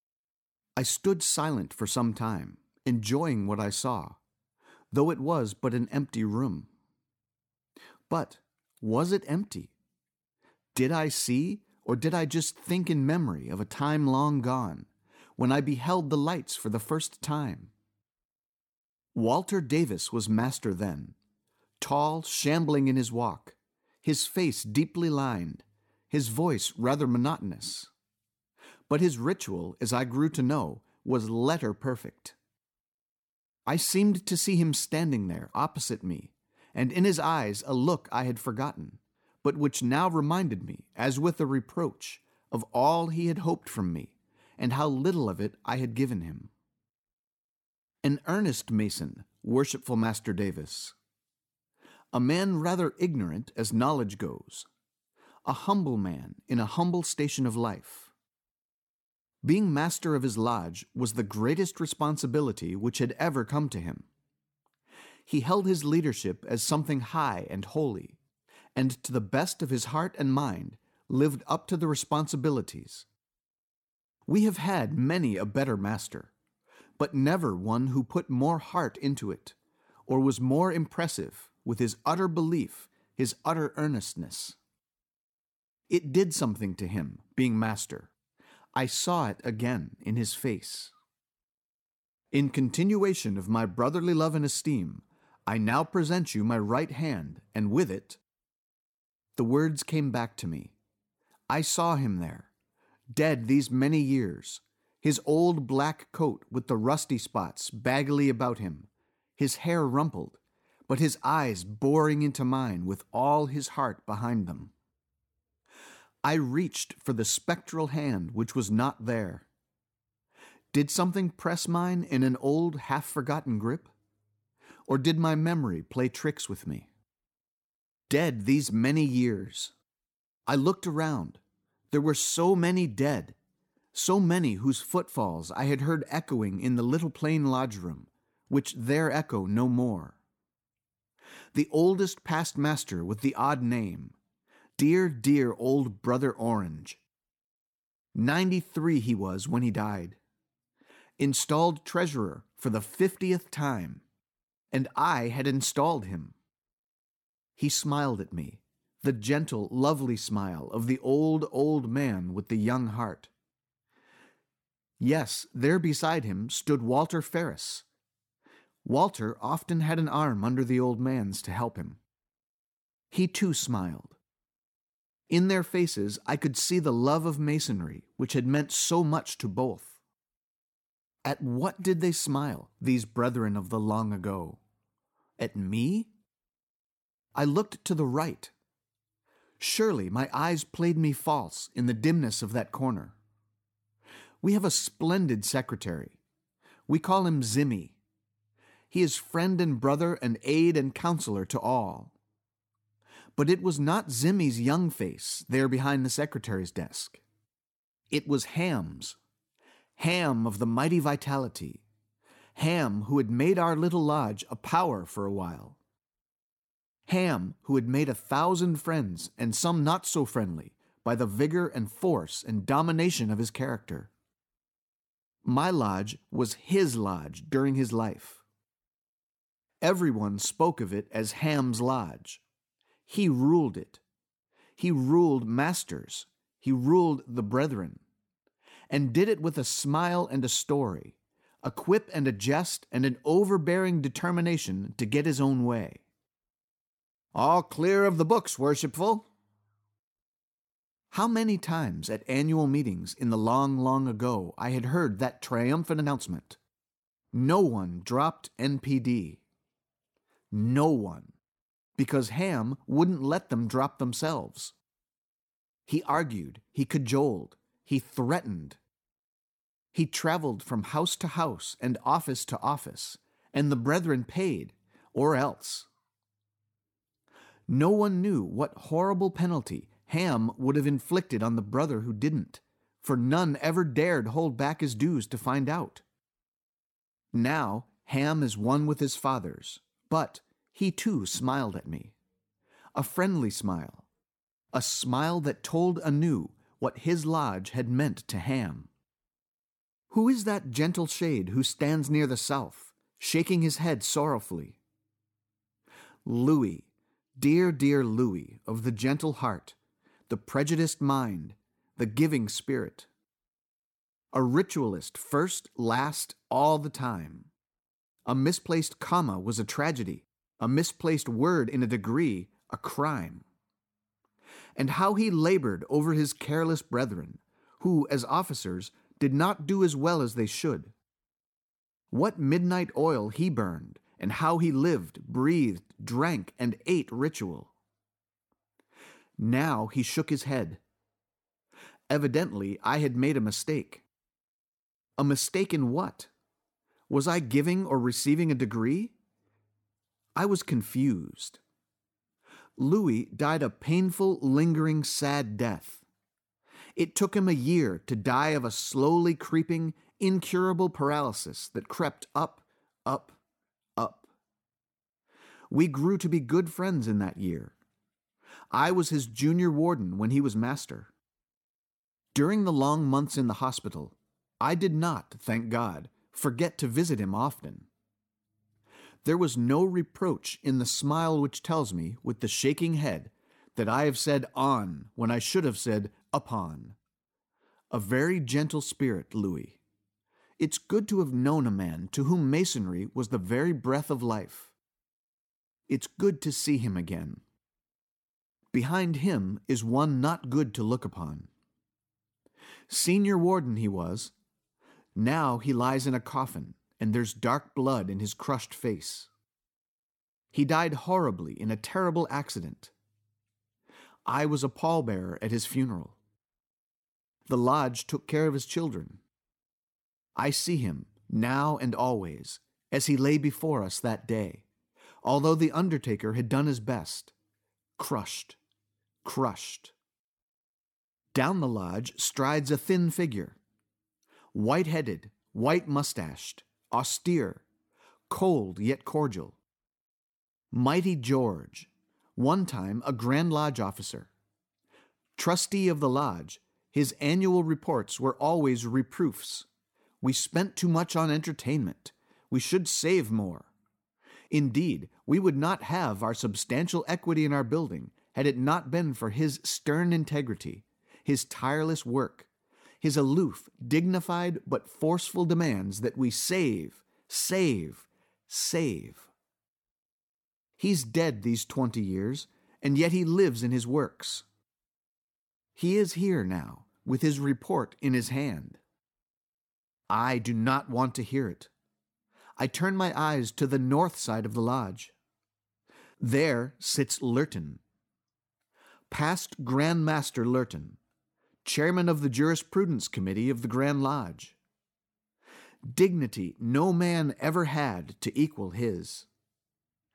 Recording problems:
uneven, jittery; slightly; from 3:02 to 7:16

